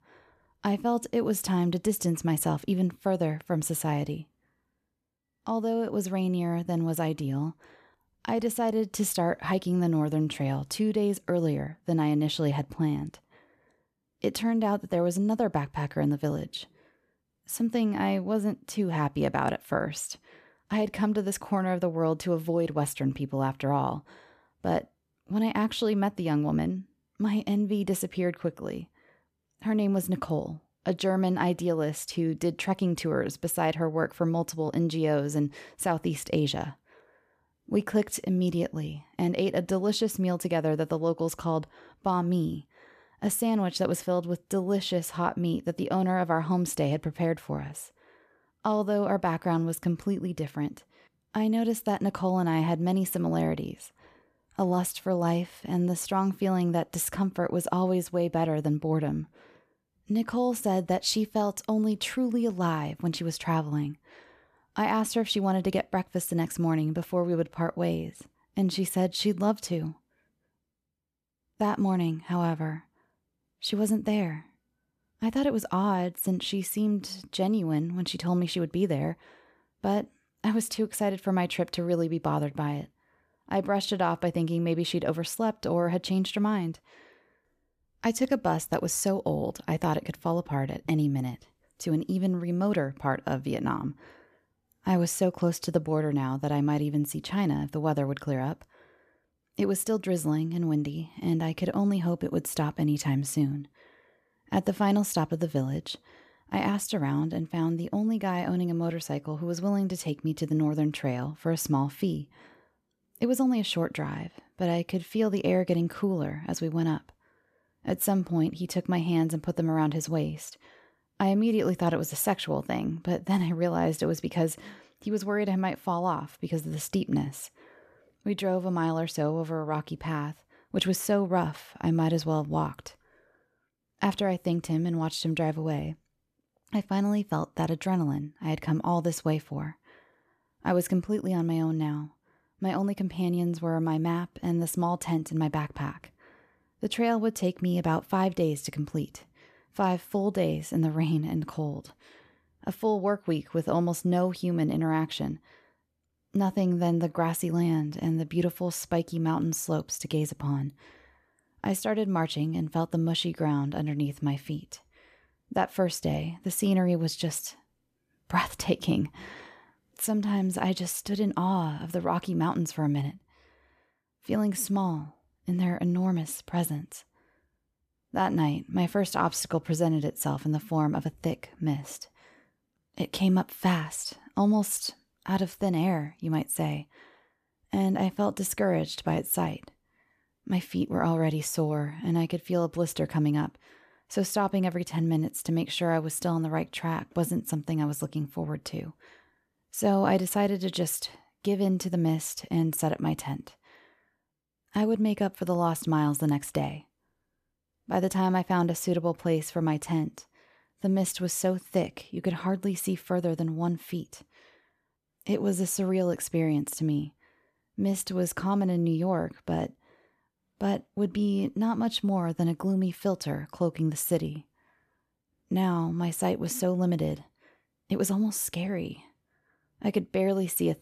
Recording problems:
none

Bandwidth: 14.5 kHz